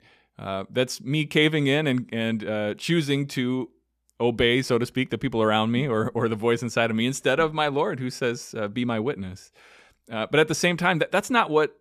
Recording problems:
none

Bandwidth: 15 kHz